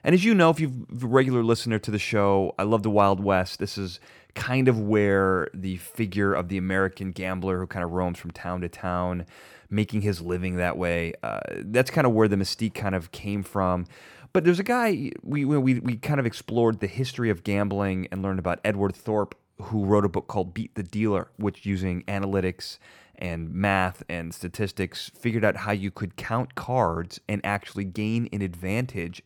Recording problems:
none

